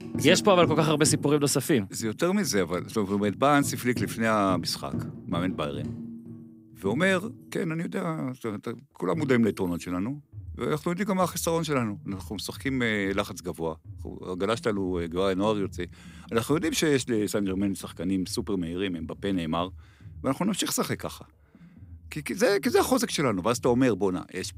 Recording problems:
background music; noticeable; throughout; 15 dB below the speech

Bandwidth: 15.5 kHz